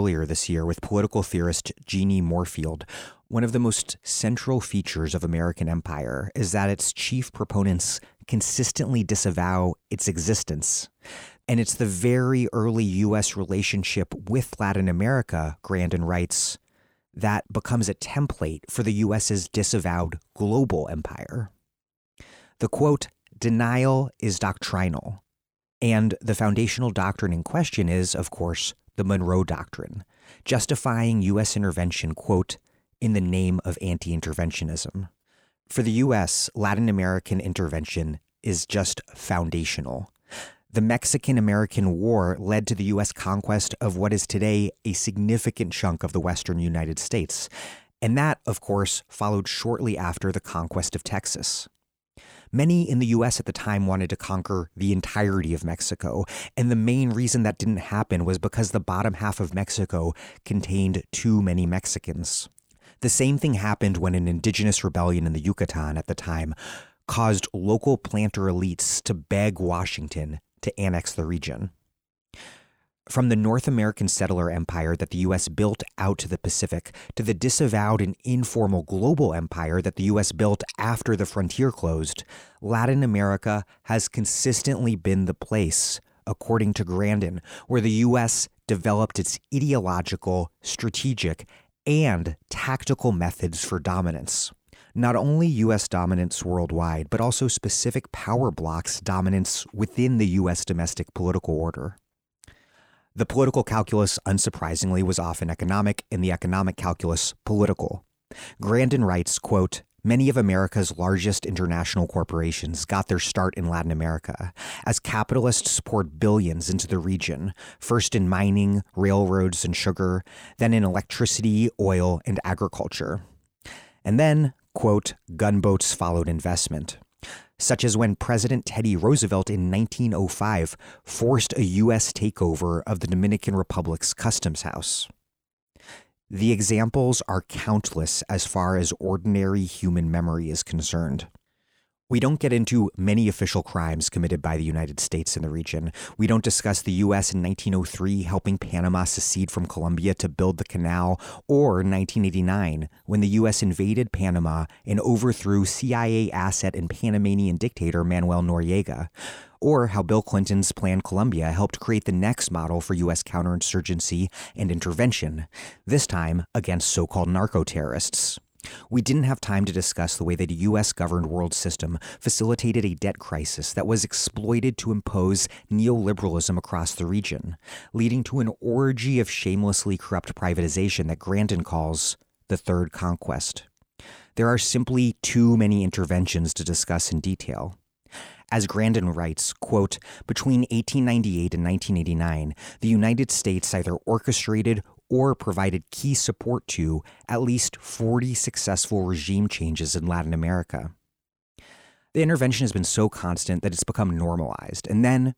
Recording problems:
abrupt cut into speech; at the start

